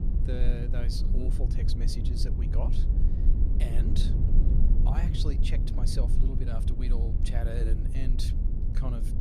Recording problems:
low rumble; loud; throughout; 3 dB below the speech

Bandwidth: 14.5 kHz